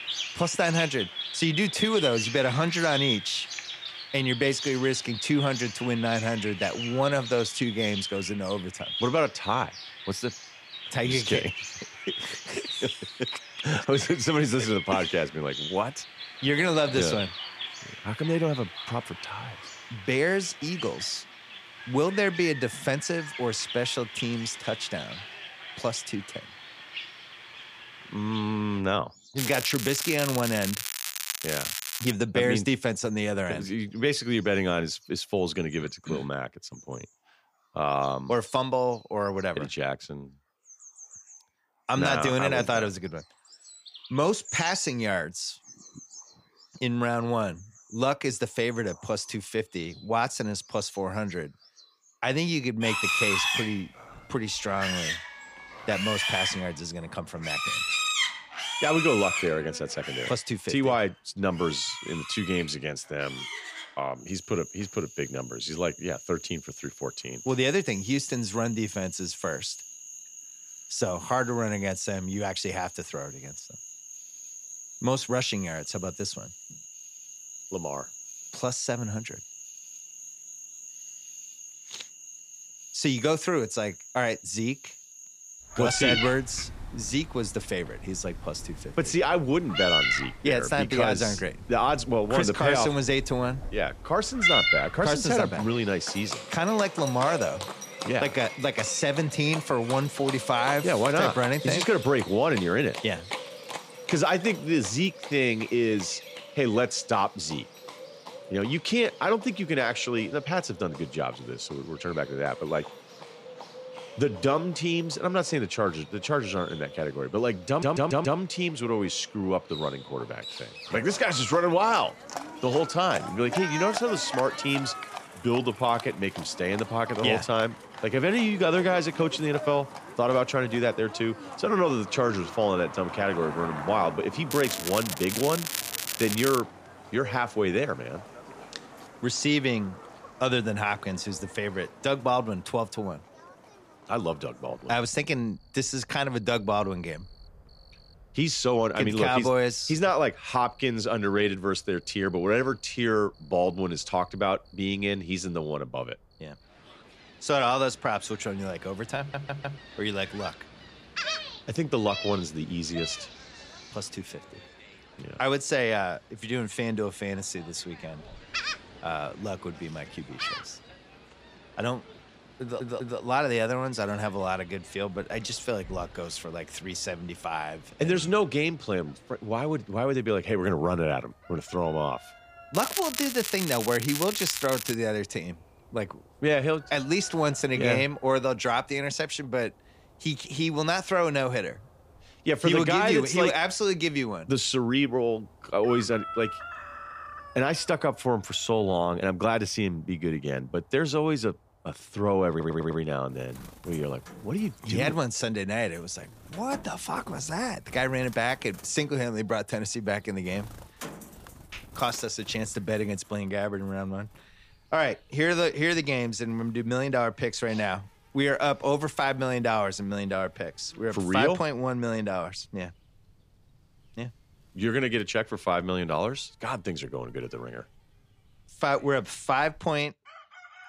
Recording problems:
animal sounds; loud; throughout; 7 dB below the speech
crackling; loud; from 29 to 32 s, from 2:15 to 2:17 and from 3:03 to 3:05; 4 dB below the speech
audio stuttering; 4 times, first at 1:58

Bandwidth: 15 kHz